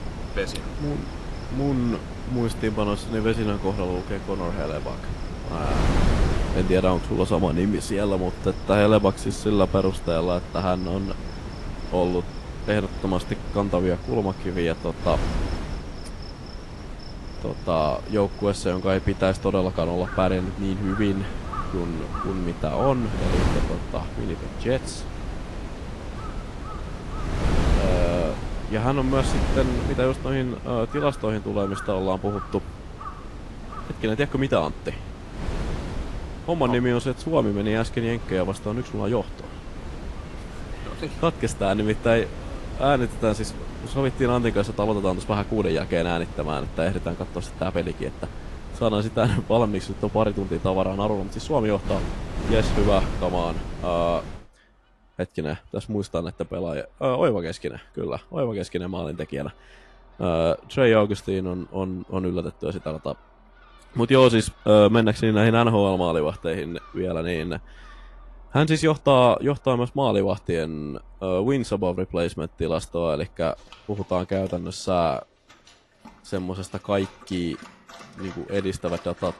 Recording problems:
garbled, watery; slightly; nothing above 11 kHz
wind noise on the microphone; occasional gusts; until 54 s; 10 dB below the speech
animal sounds; faint; throughout; 20 dB below the speech

